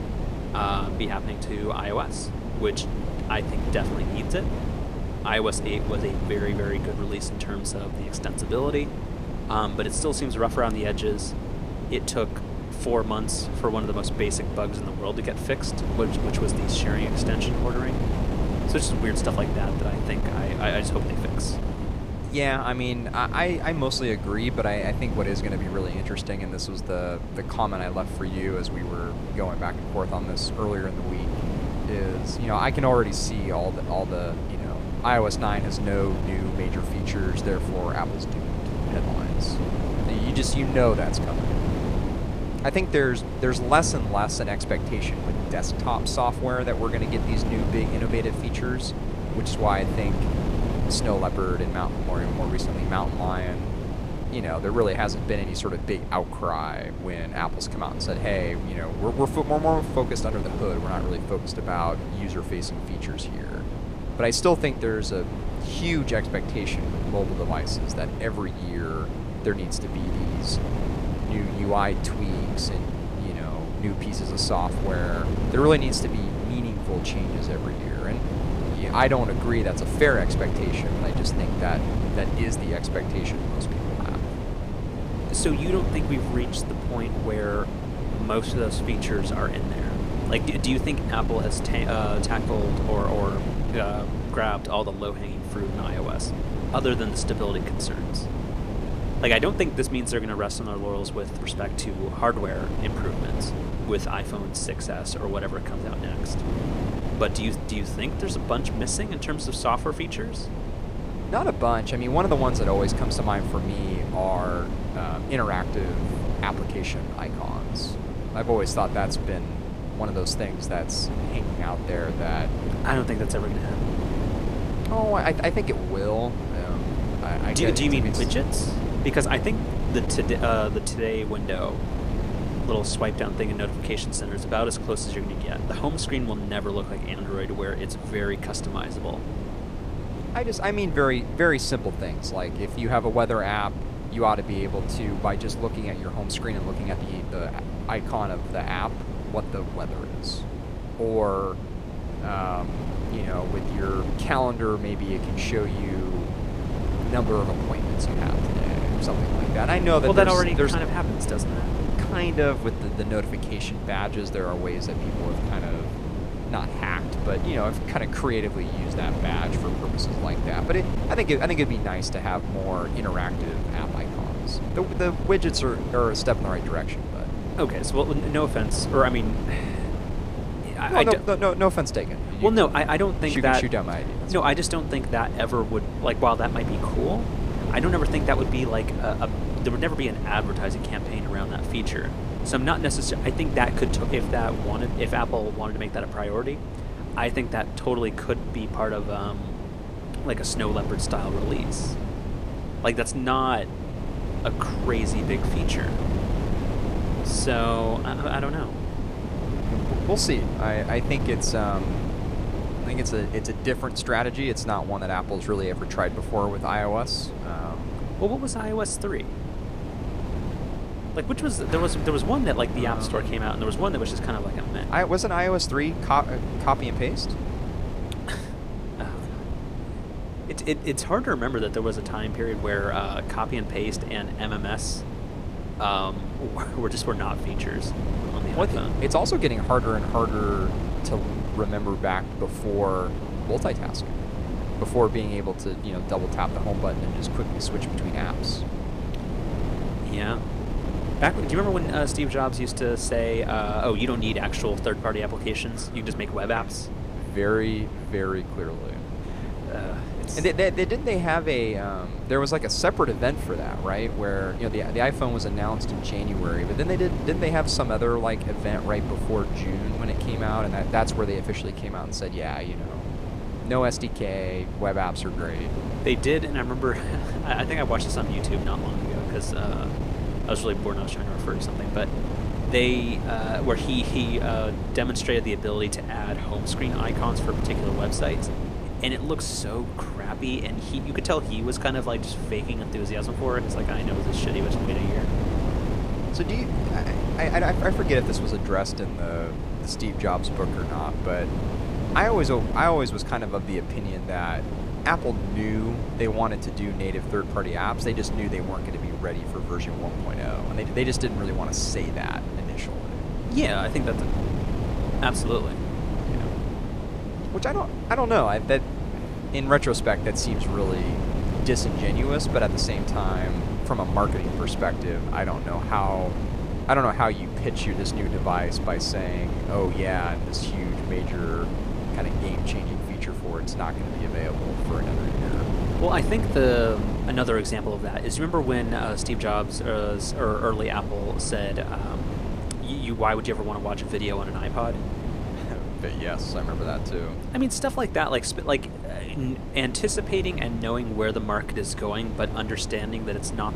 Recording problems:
wind noise on the microphone; heavy; 8 dB below the speech

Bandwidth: 14.5 kHz